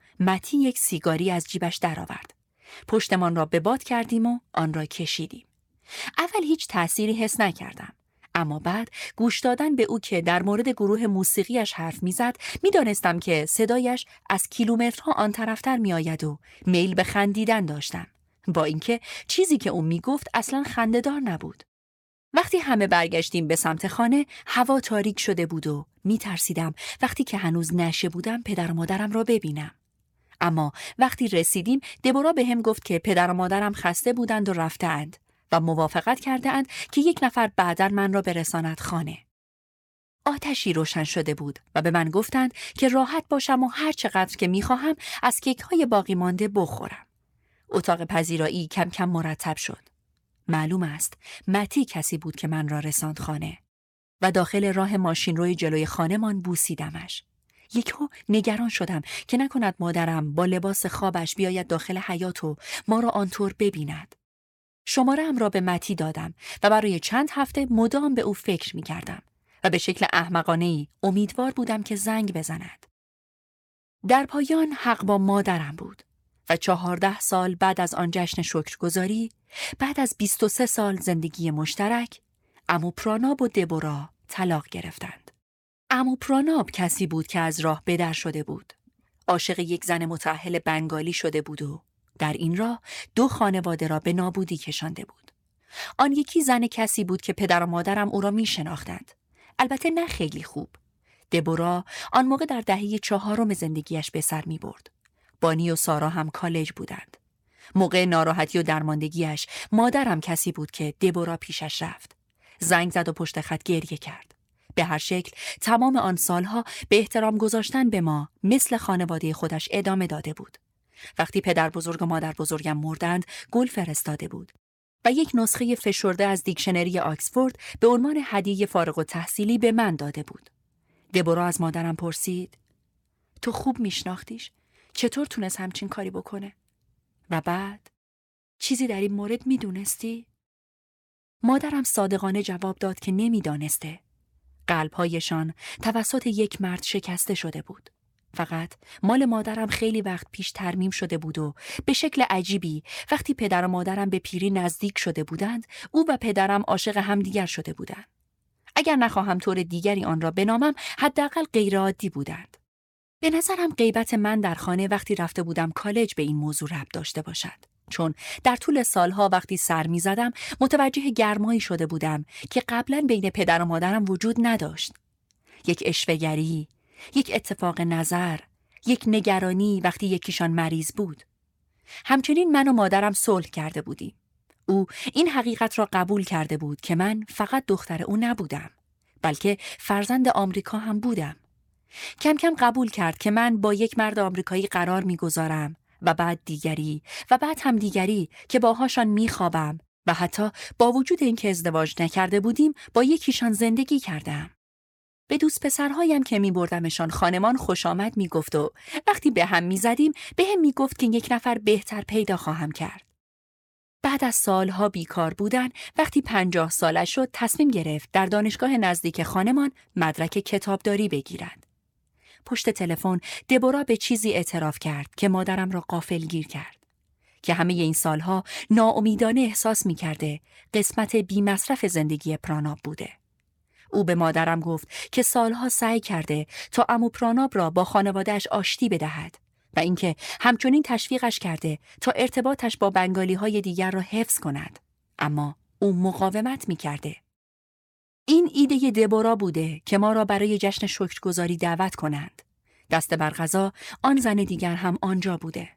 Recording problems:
none

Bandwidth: 17.5 kHz